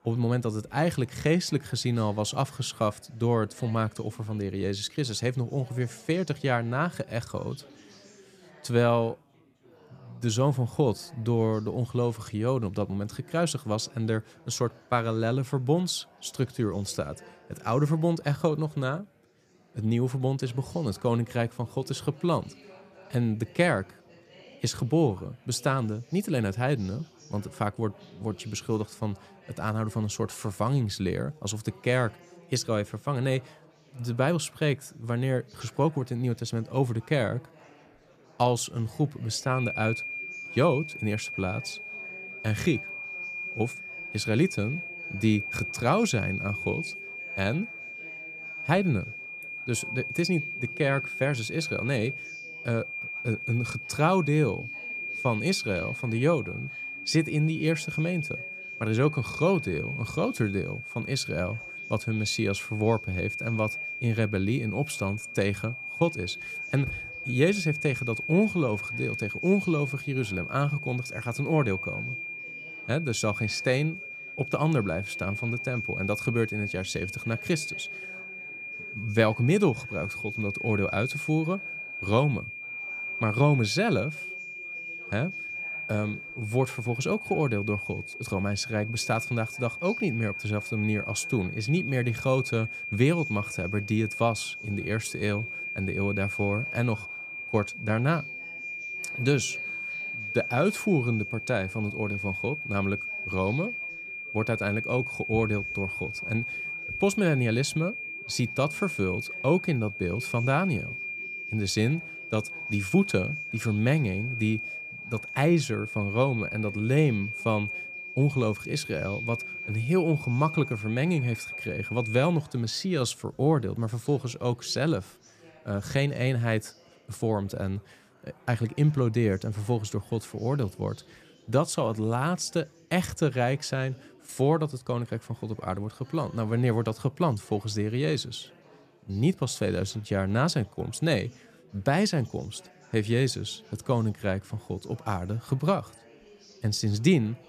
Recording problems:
high-pitched whine; loud; from 40 s to 2:02; 2.5 kHz, 6 dB below the speech
chatter from many people; faint; throughout; 25 dB below the speech

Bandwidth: 14.5 kHz